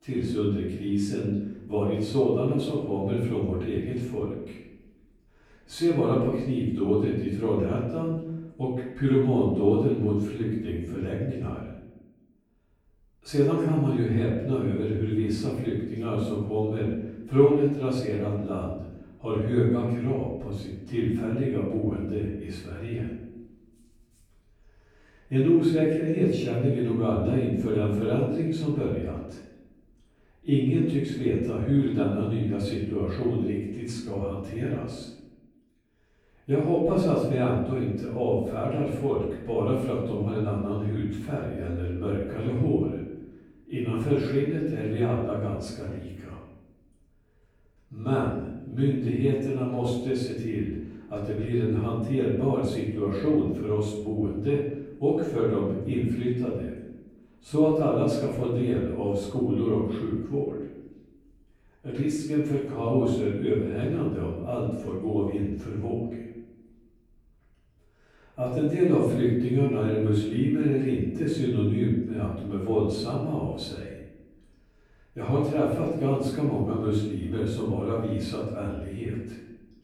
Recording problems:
off-mic speech; far
room echo; noticeable; dies away in 0.9 s

